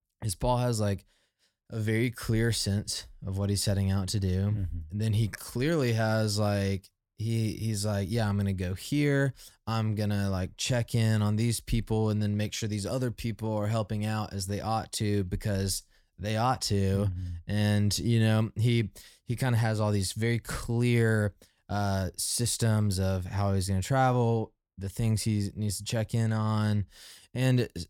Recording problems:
none

